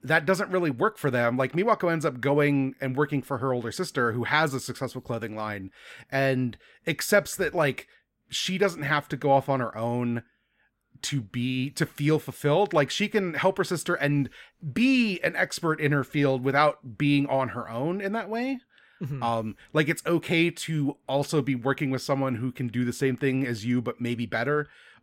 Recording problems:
none

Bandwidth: 16 kHz